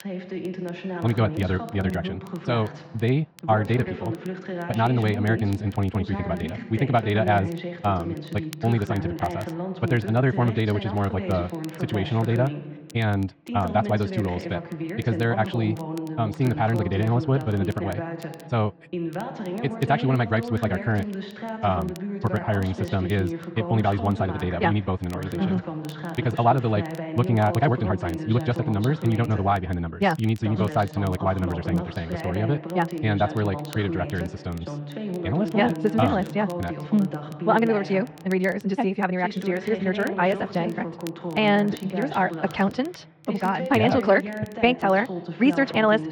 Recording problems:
wrong speed, natural pitch; too fast; 1.7 times normal speed
muffled; slightly; fading above 3 kHz
voice in the background; loud; throughout; 8 dB below the speech
crackle, like an old record; faint; 25 dB below the speech

